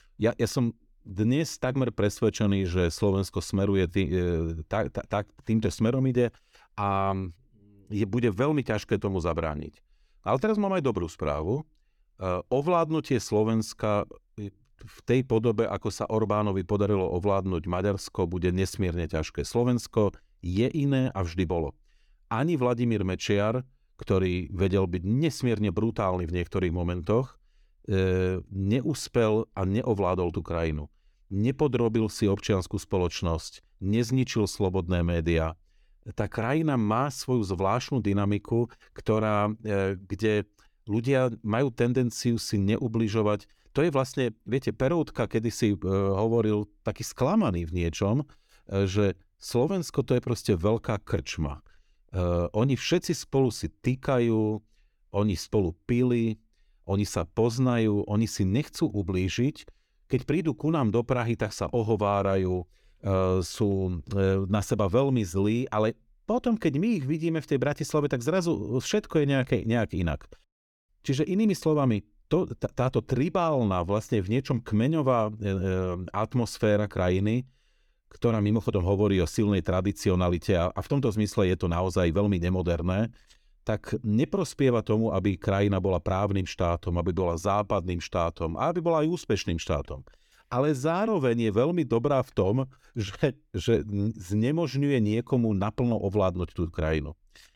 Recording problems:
none

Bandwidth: 17.5 kHz